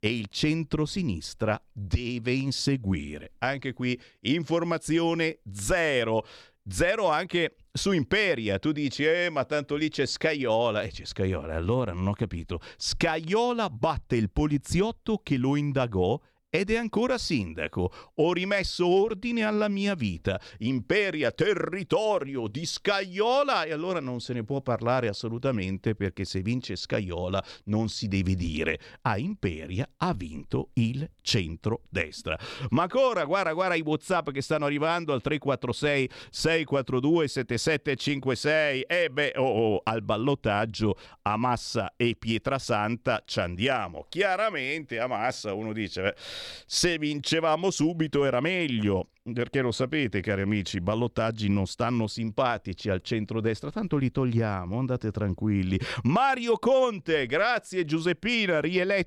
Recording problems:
none

